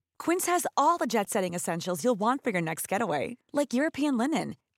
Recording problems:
none

